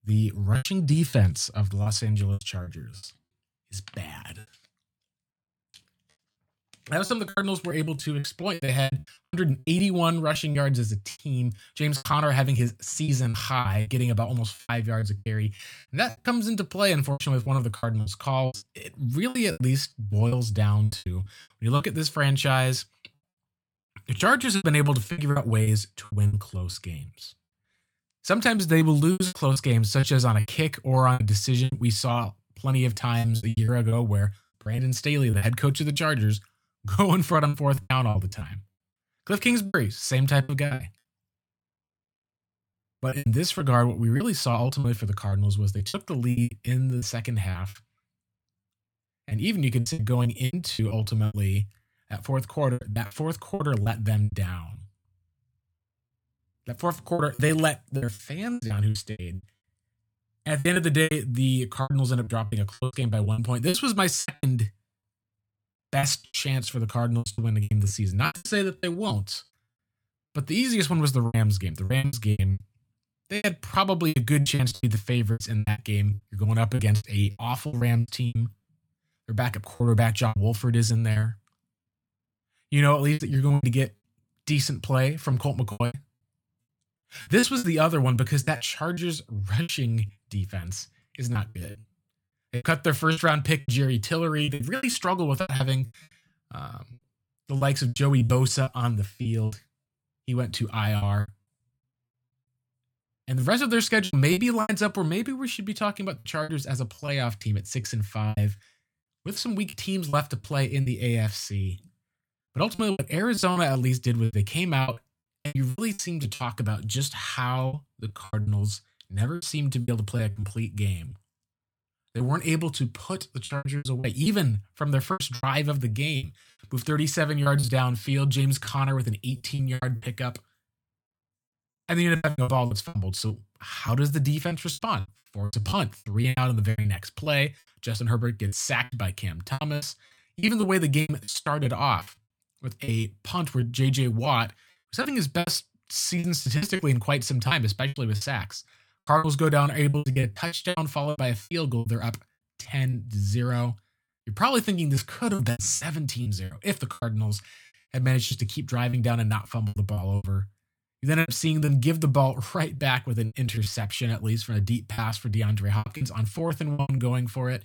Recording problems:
choppy; very; 14% of the speech affected

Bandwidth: 18 kHz